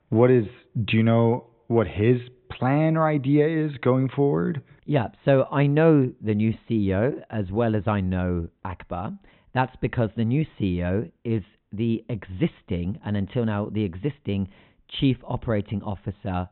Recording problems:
high frequencies cut off; severe; nothing above 4 kHz

